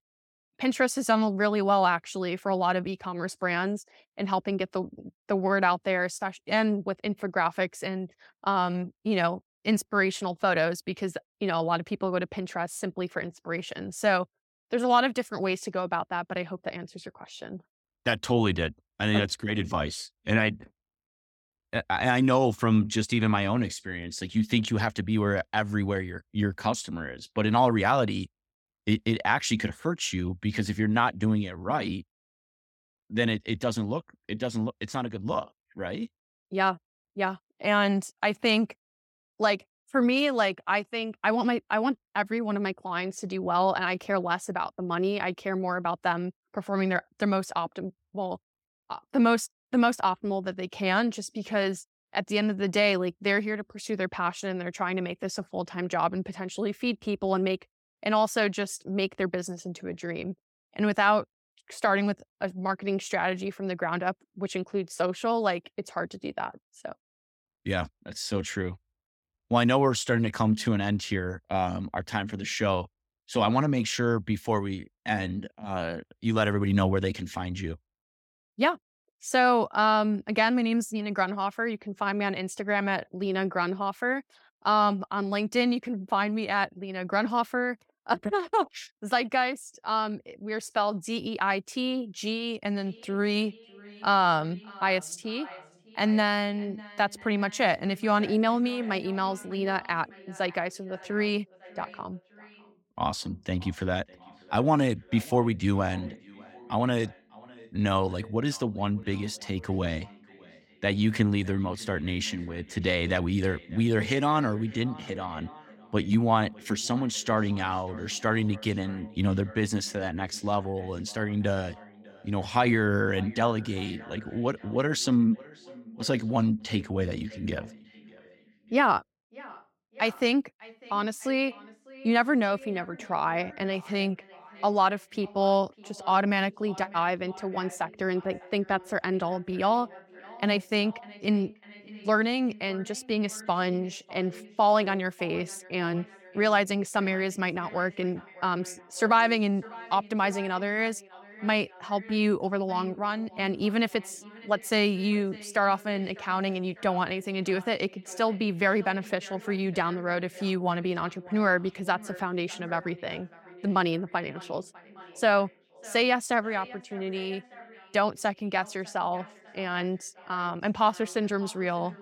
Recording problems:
echo of what is said; faint; from 1:33 on; 600 ms later, 20 dB below the speech

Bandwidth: 17 kHz